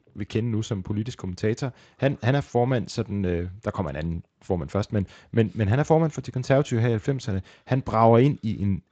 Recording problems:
garbled, watery; slightly; nothing above 7.5 kHz

